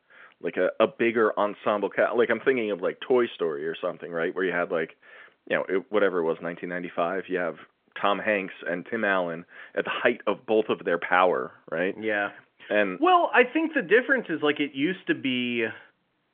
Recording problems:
phone-call audio; nothing above 3.5 kHz

